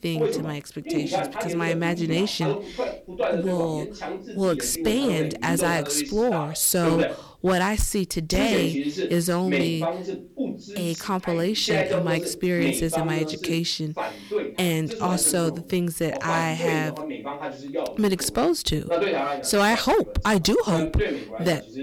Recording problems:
distortion; slight; 4% of the sound clipped
voice in the background; loud; throughout; 4 dB below the speech

